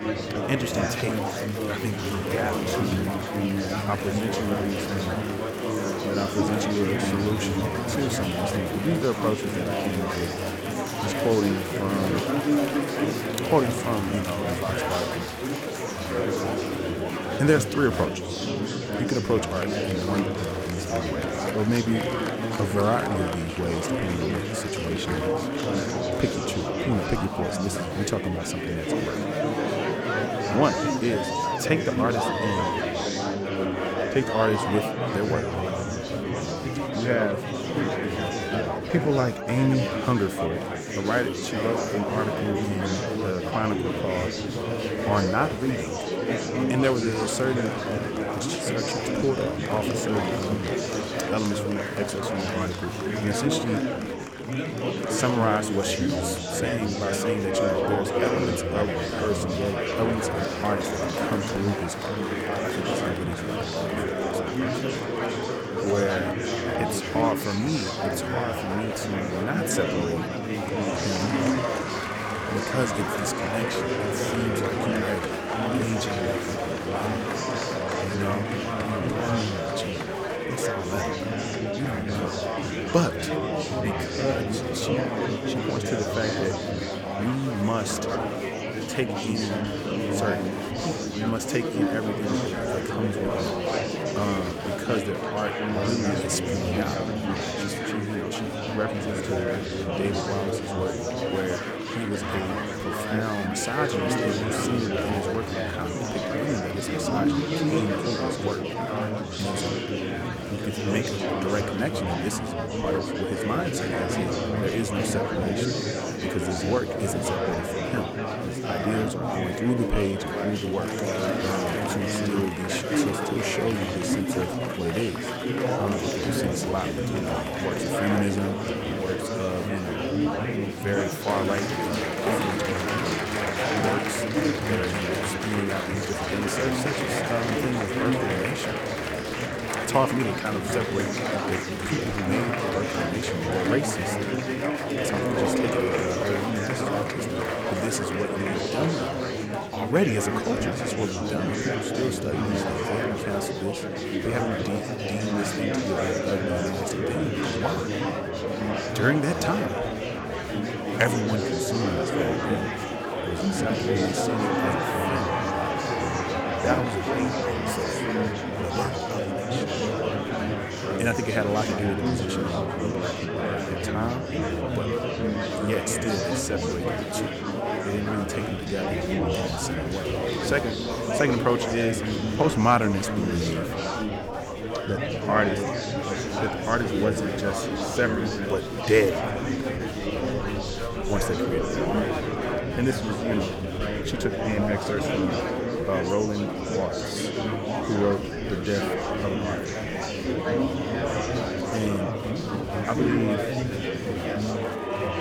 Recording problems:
murmuring crowd; very loud; throughout; 2 dB above the speech

